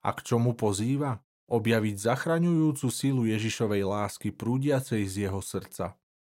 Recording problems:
none

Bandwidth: 16 kHz